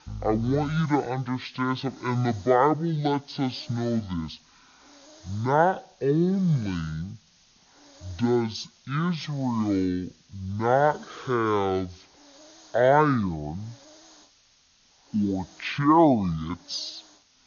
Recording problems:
wrong speed and pitch; too slow and too low; 0.5 times normal speed
hiss; faint; throughout; 25 dB below the speech

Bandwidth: 6.5 kHz